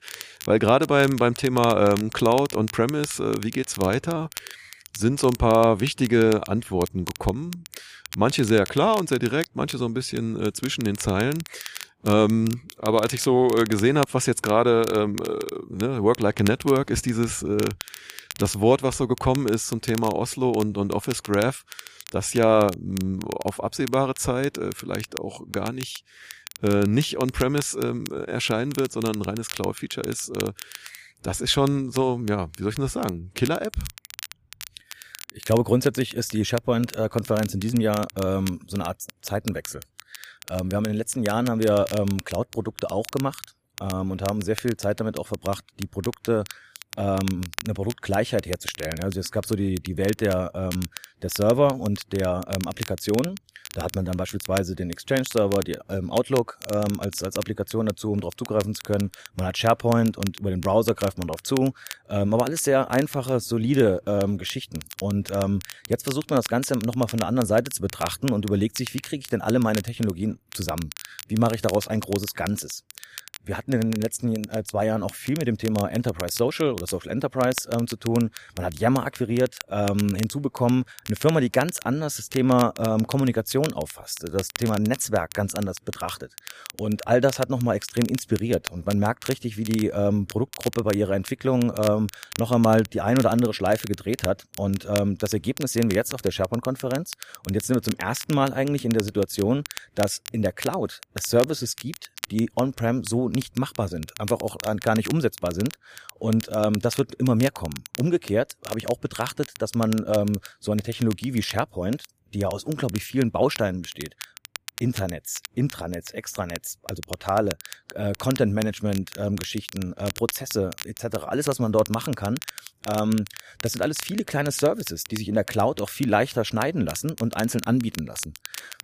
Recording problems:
crackle, like an old record; noticeable; 15 dB below the speech

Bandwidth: 15 kHz